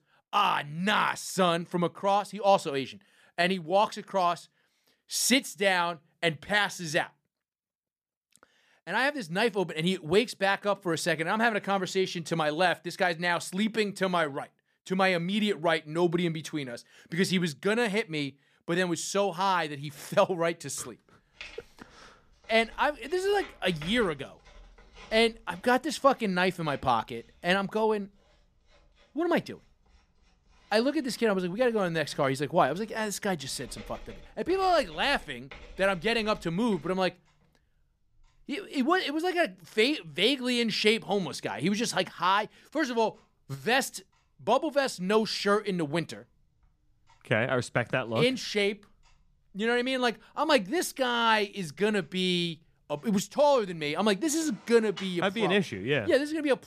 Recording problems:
household noises; faint; from 21 s on; 25 dB below the speech

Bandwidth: 14.5 kHz